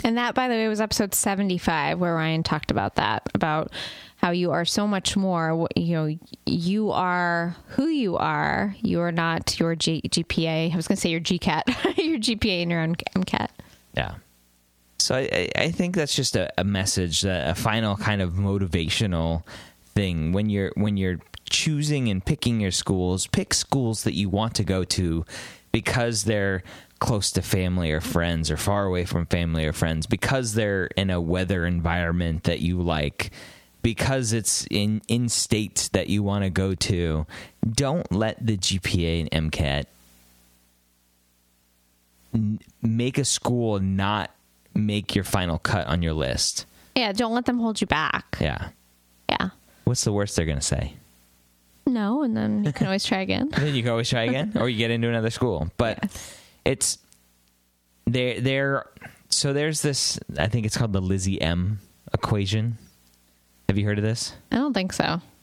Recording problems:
squashed, flat; somewhat

